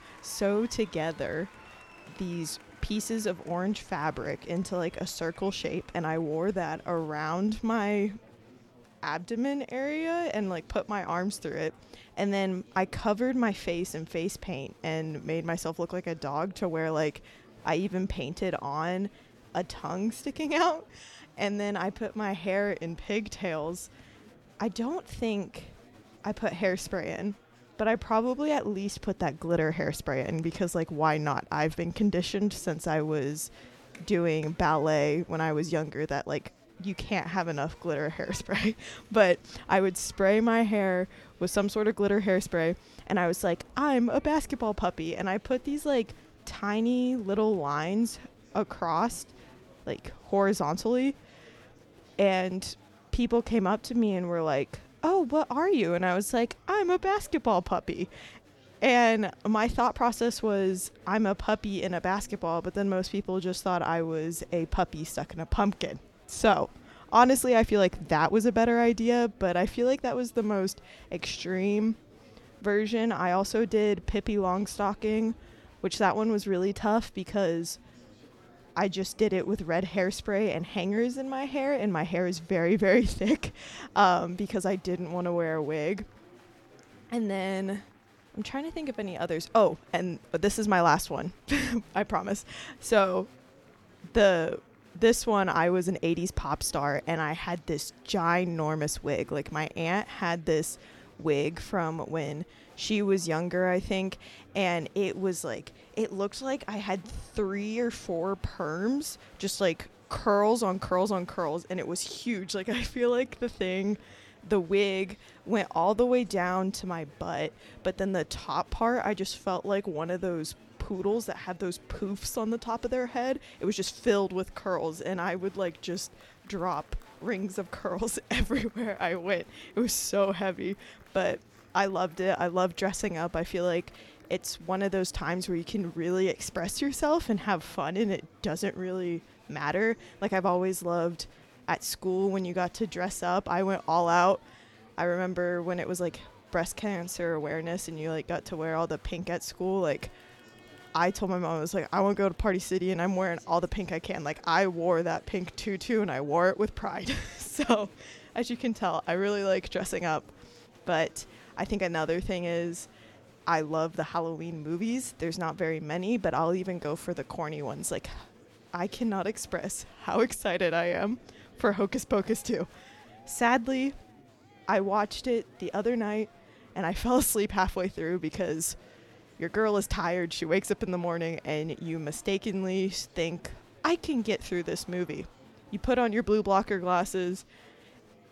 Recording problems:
murmuring crowd; faint; throughout; 25 dB below the speech

